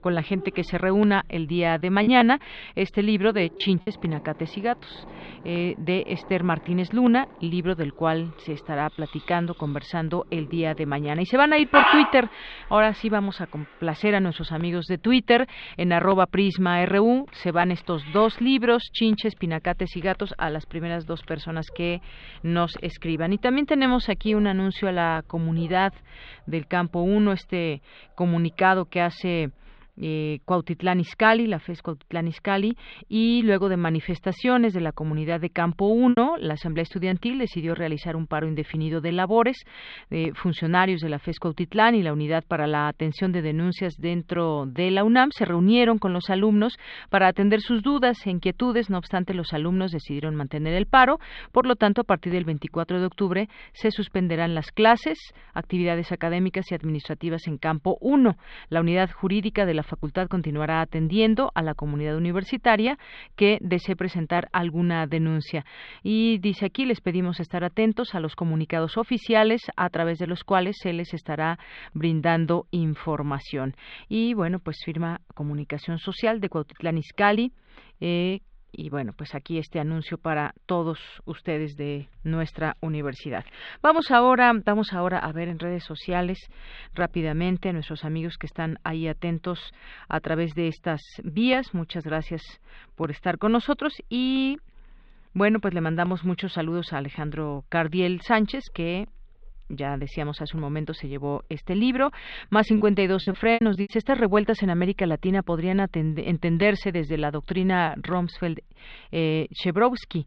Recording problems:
muffled; slightly; fading above 3.5 kHz
animal sounds; loud; until 30 s; 3 dB below the speech
choppy; very; from 2 to 4 s, from 36 to 37 s and from 1:43 to 1:44; 12% of the speech affected

